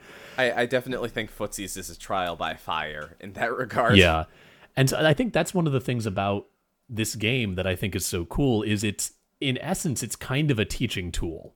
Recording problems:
none

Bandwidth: 18.5 kHz